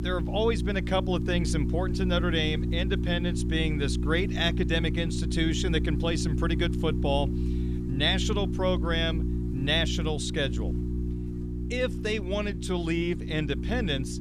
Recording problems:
electrical hum; loud; throughout; 60 Hz, 9 dB below the speech

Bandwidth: 14.5 kHz